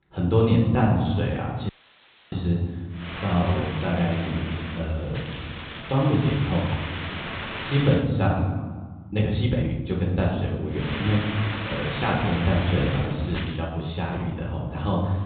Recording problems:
off-mic speech; far
high frequencies cut off; severe; nothing above 4 kHz
room echo; noticeable; dies away in 1.2 s
hiss; loud; from 3 to 8 s and from 11 to 14 s; 8 dB below the speech
uneven, jittery; strongly; from 0.5 to 14 s
audio cutting out; filled with static; at 1.5 s for 0.5 s

